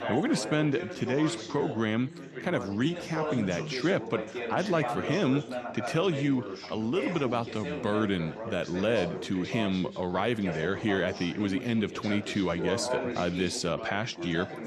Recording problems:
background chatter; loud; throughout; 4 voices, 7 dB below the speech

